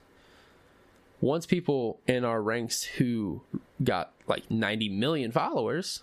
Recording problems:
squashed, flat; heavily

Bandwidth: 14.5 kHz